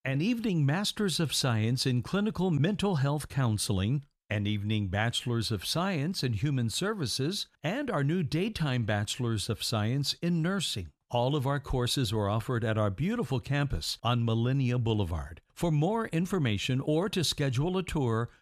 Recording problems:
none

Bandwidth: 14.5 kHz